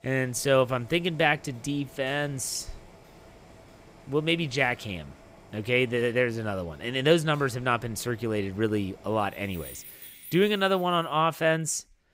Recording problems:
household noises; faint; throughout; 20 dB below the speech

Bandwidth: 15.5 kHz